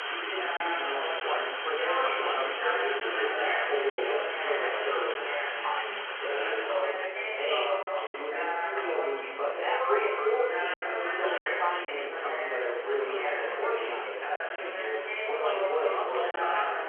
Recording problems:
off-mic speech; far
room echo; noticeable; dies away in 0.6 s
phone-call audio; nothing above 3 kHz
chatter from many people; very loud; throughout; 2 dB above the speech
choppy; occasionally; 3% of the speech affected

